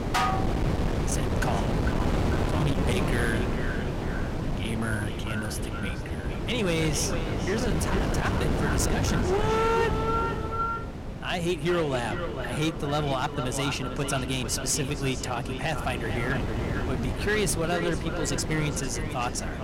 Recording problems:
echo of what is said; strong; throughout; 450 ms later, 7 dB below the speech
distortion; slight; 11% of the sound clipped
wind noise on the microphone; heavy; 5 dB below the speech
clattering dishes; loud; at the start; peak 3 dB above the speech
uneven, jittery; strongly; from 1 to 19 s

